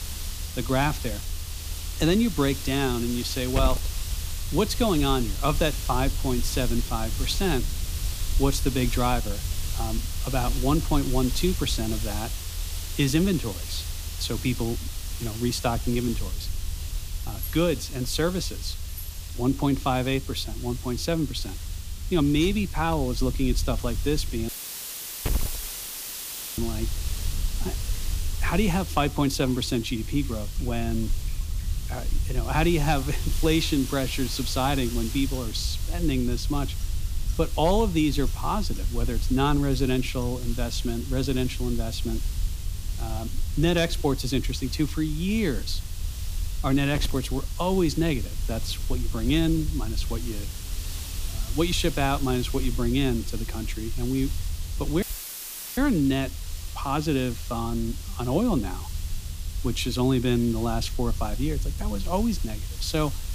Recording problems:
hiss; noticeable; throughout; 10 dB below the speech
high-pitched whine; faint; throughout; 7.5 kHz, 35 dB below the speech
household noises; faint; until 40 s; 25 dB below the speech
low rumble; faint; throughout; 25 dB below the speech
audio cutting out; filled with static; at 24 s for 2 s and at 55 s for 1 s

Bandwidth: 15 kHz